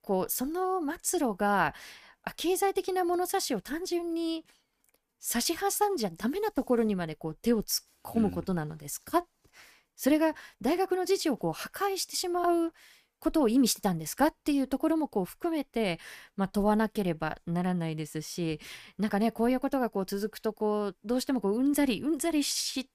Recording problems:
none

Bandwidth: 15 kHz